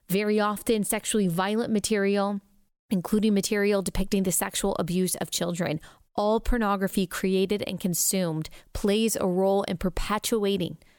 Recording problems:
none

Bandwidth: 17.5 kHz